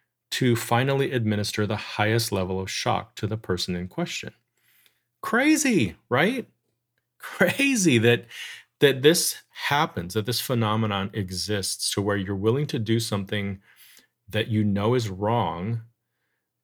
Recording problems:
none

